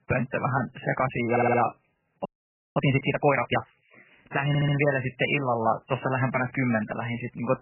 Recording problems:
garbled, watery; badly; nothing above 3 kHz
audio stuttering; at 1.5 s and at 4.5 s
audio freezing; at 2.5 s for 0.5 s

